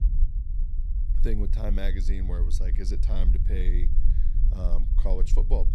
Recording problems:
low rumble; loud; throughout; 9 dB below the speech

